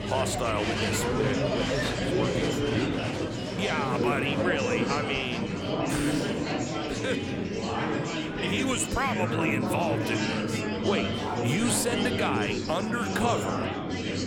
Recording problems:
murmuring crowd; very loud; throughout; 2 dB above the speech

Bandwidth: 17.5 kHz